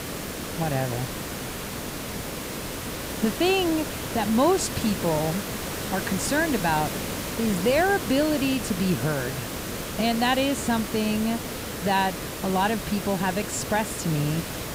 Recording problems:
hiss; loud; throughout; 6 dB below the speech

